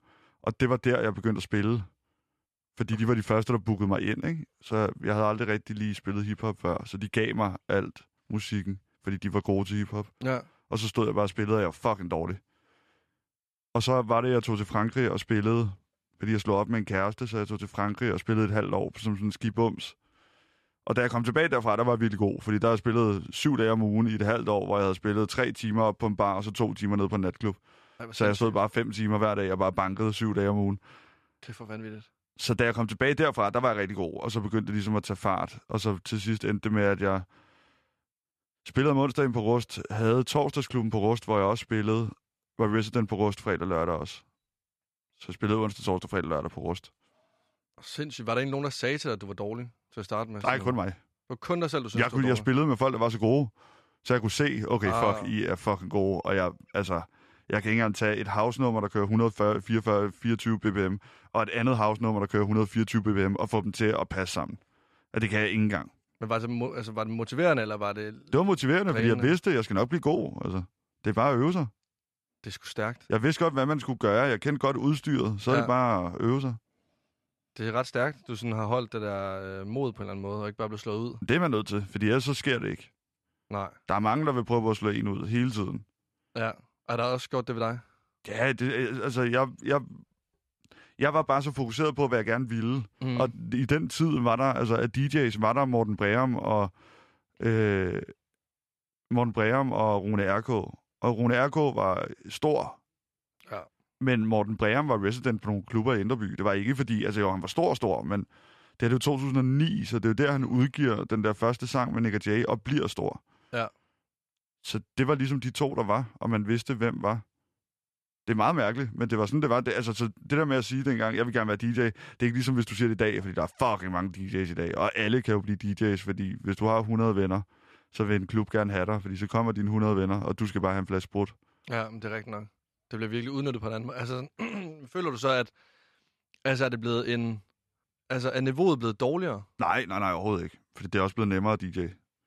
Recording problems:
none

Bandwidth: 13.5 kHz